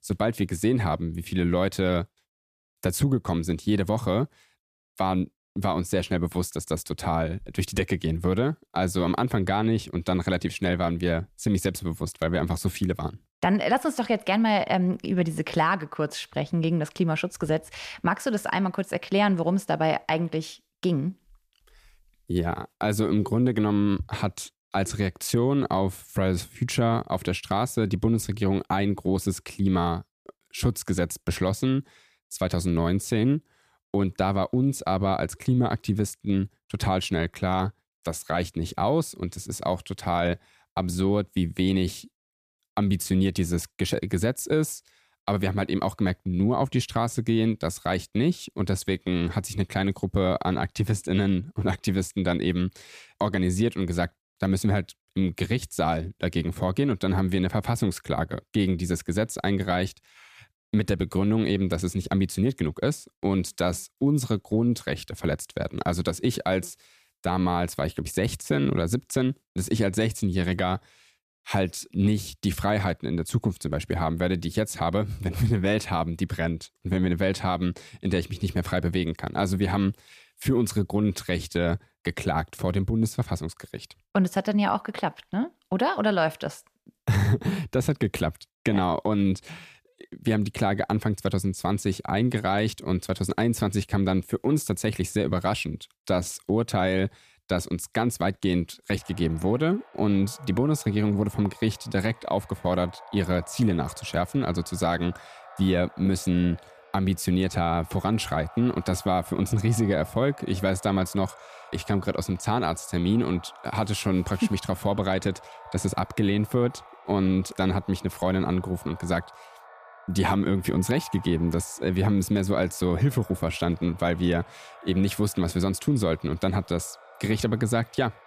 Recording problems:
echo of what is said; faint; from 1:39 on; 130 ms later, 20 dB below the speech

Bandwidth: 14.5 kHz